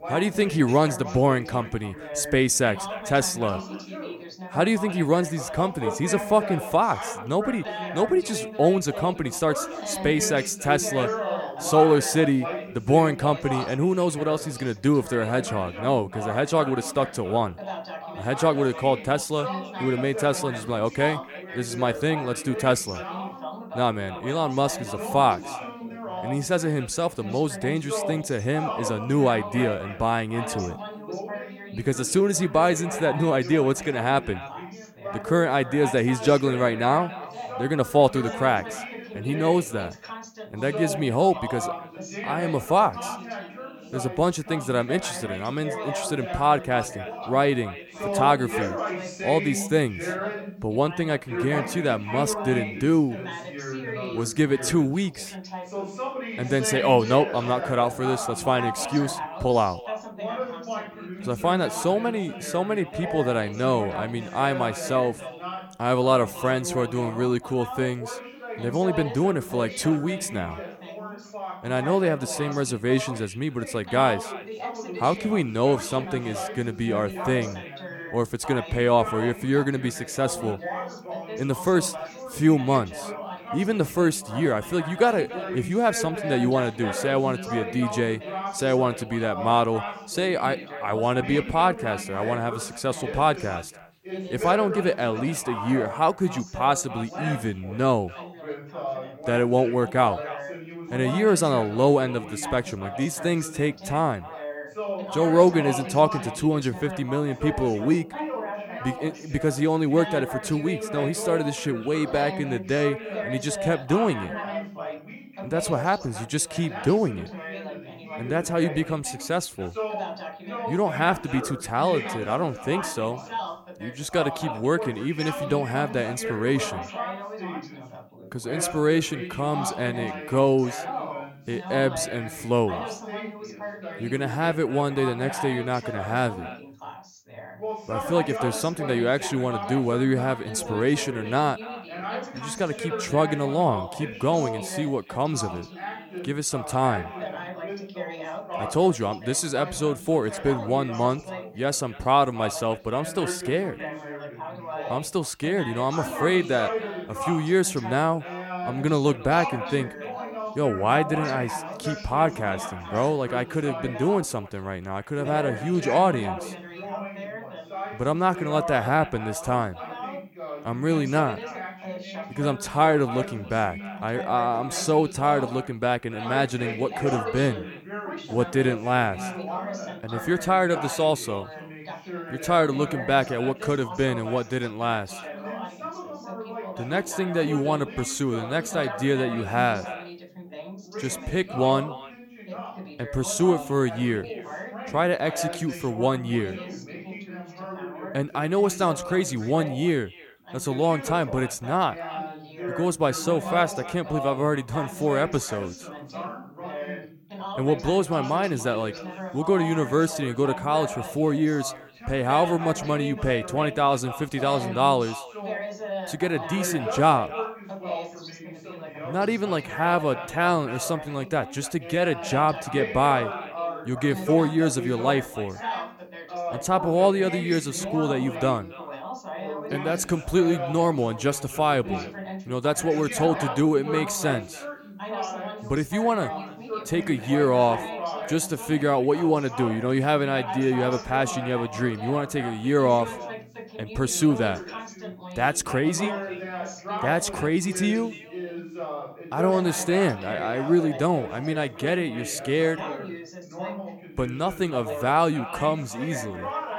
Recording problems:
echo of what is said; faint; throughout; 280 ms later, 20 dB below the speech
background chatter; loud; throughout; 2 voices, 10 dB below the speech

